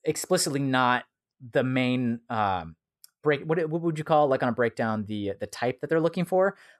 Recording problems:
none

